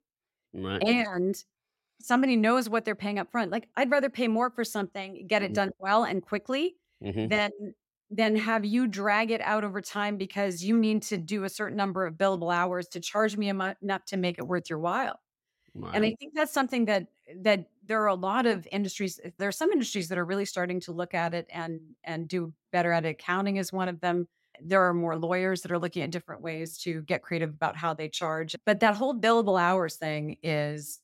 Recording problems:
none

